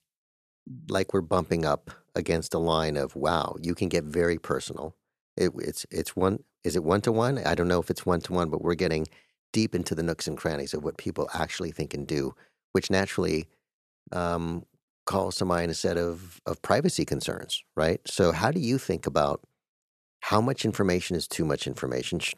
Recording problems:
none

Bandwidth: 13.5 kHz